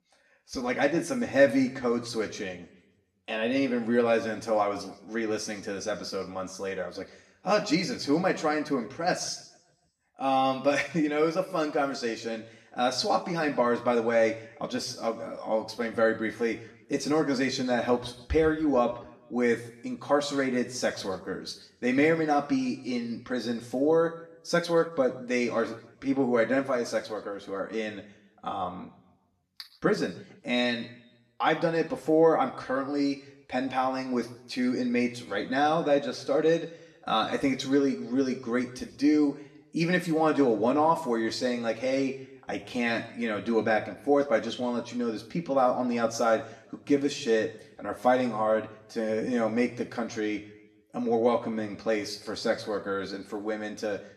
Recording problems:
room echo; slight; dies away in 0.6 s
off-mic speech; somewhat distant

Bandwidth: 13.5 kHz